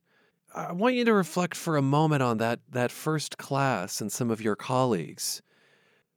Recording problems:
none

